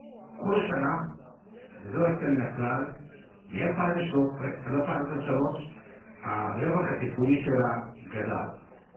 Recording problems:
off-mic speech; far
garbled, watery; badly; nothing above 8 kHz
room echo; slight; dies away in 0.4 s
background chatter; faint; throughout; 3 voices, 20 dB below the speech

